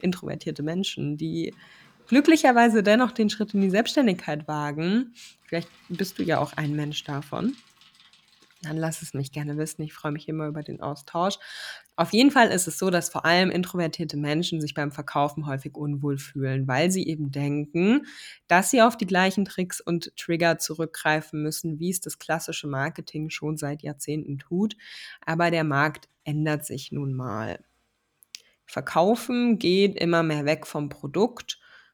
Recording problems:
traffic noise; faint; throughout; 30 dB below the speech

